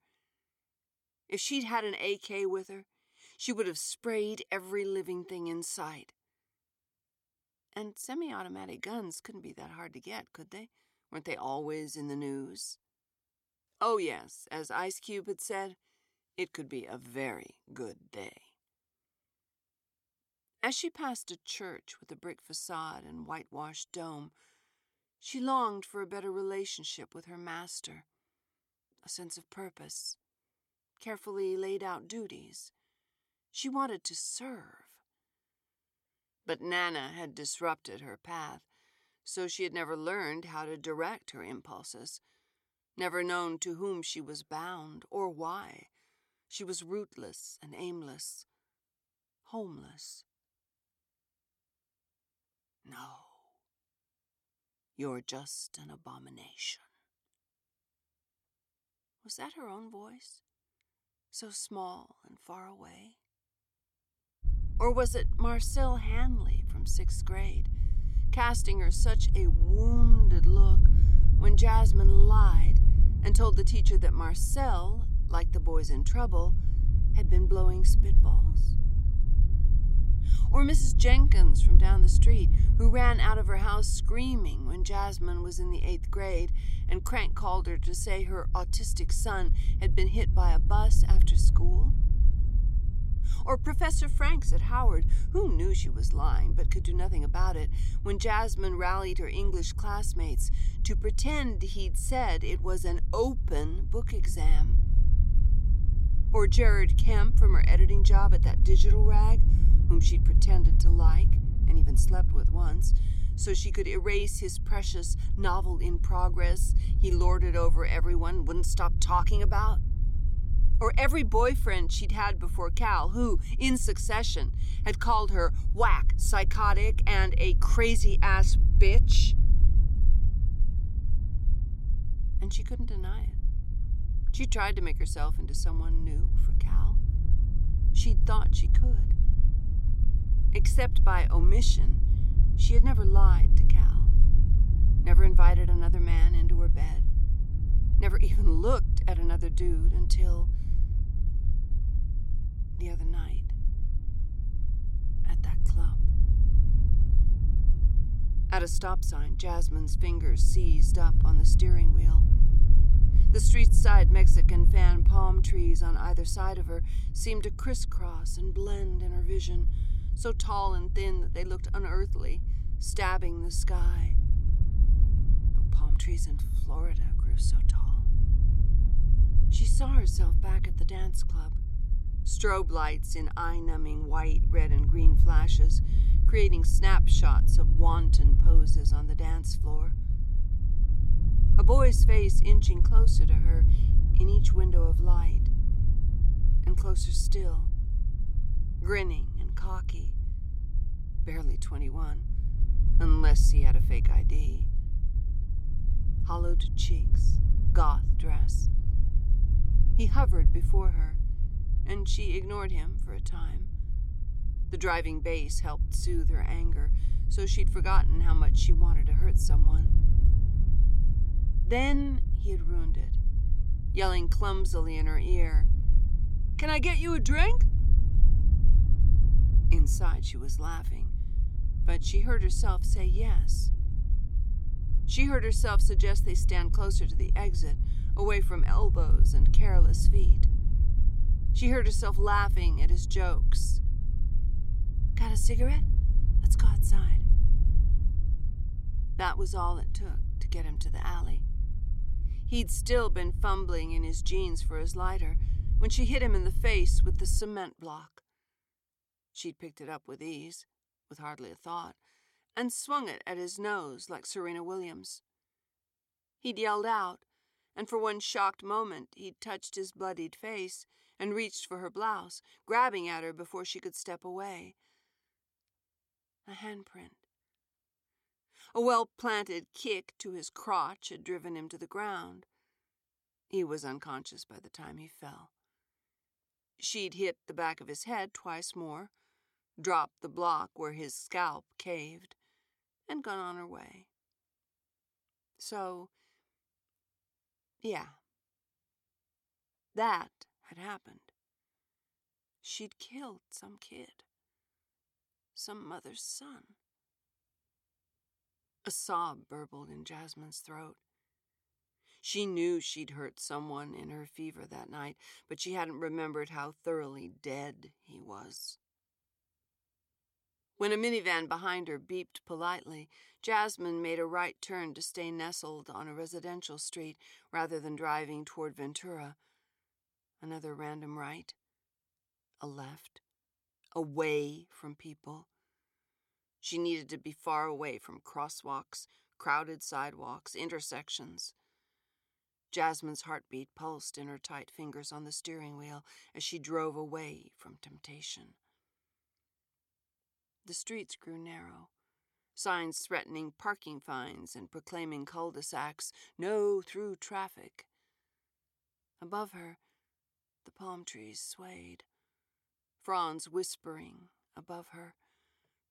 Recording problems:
low rumble; noticeable; from 1:04 to 4:17; 10 dB below the speech

